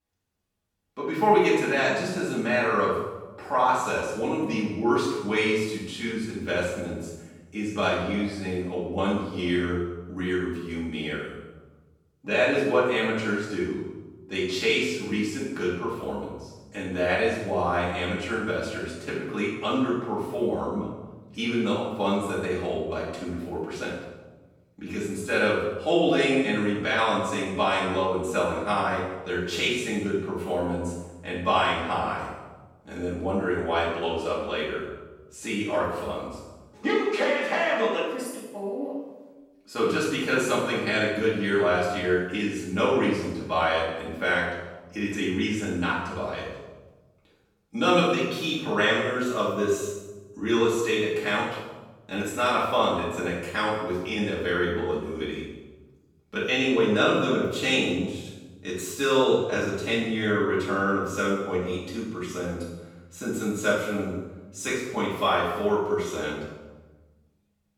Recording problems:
room echo; strong; dies away in 1 s
off-mic speech; far

